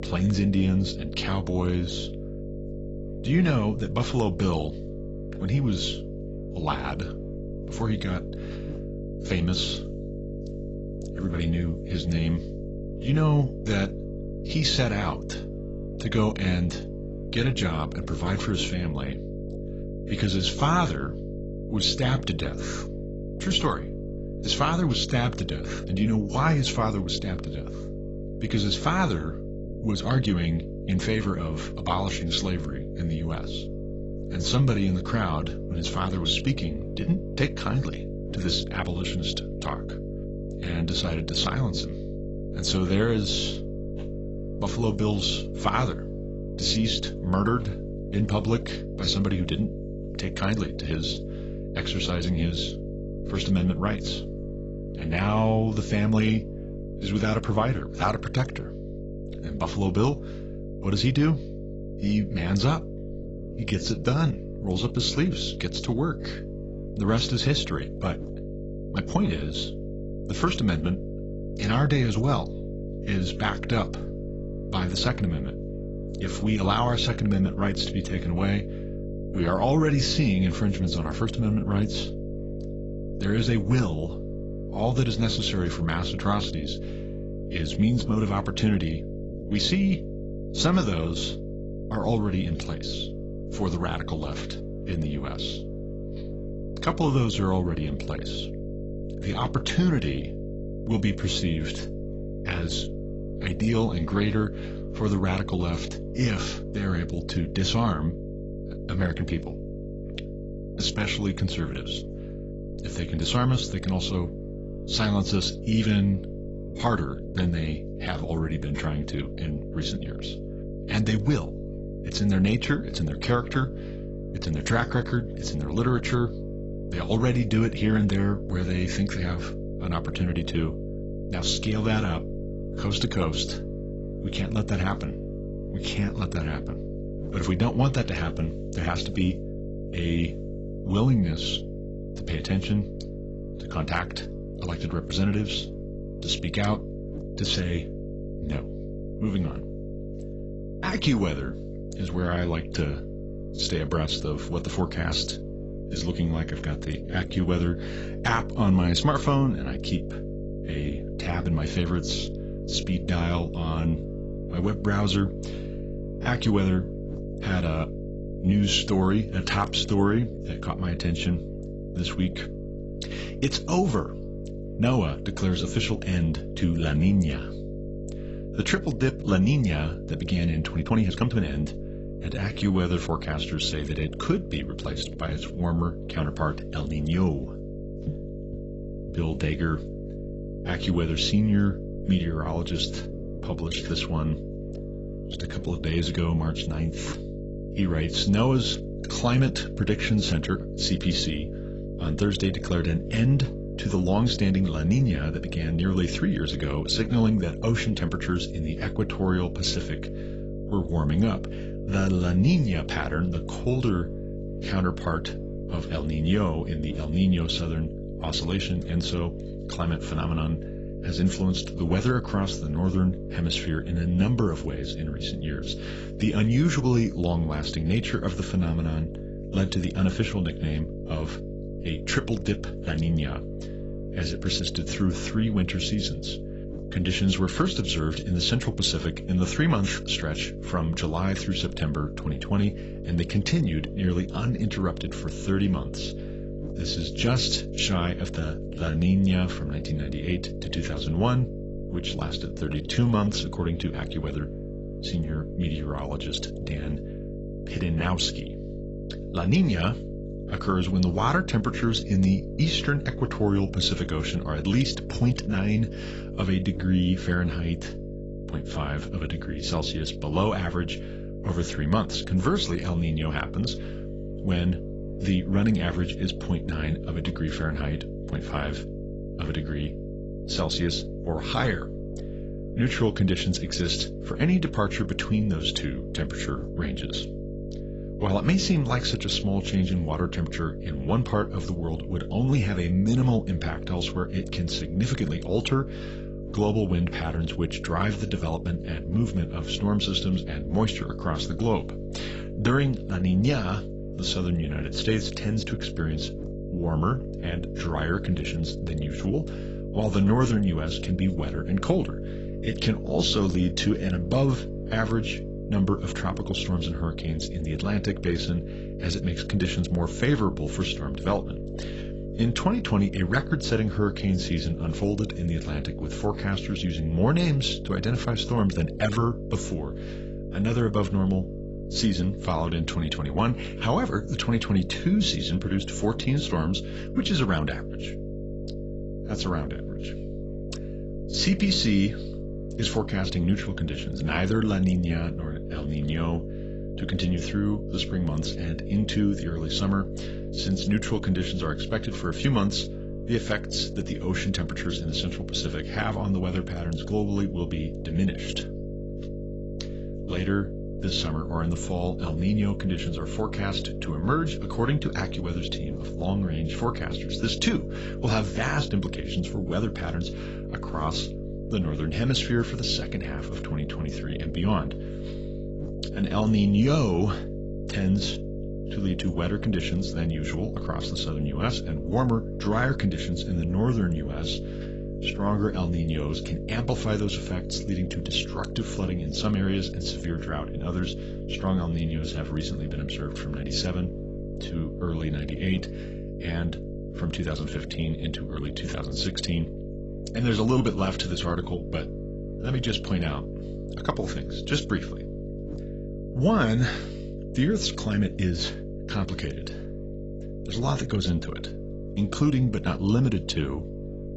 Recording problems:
garbled, watery; badly; nothing above 8 kHz
electrical hum; loud; throughout; 50 Hz, 10 dB below the speech
uneven, jittery; strongly; from 30 s to 6:38

